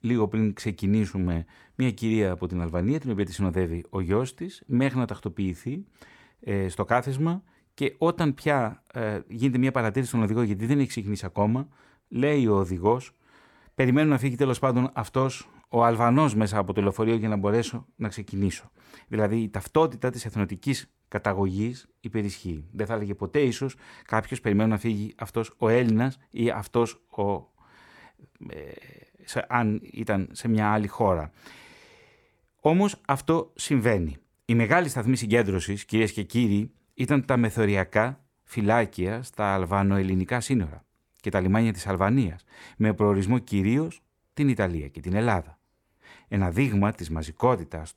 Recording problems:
none

